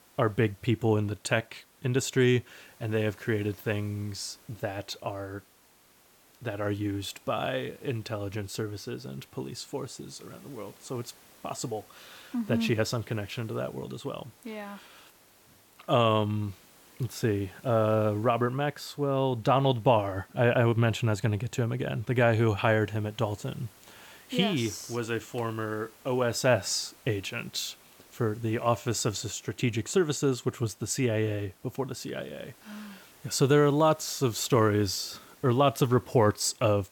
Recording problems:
hiss; faint; throughout; 25 dB below the speech

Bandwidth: 17.5 kHz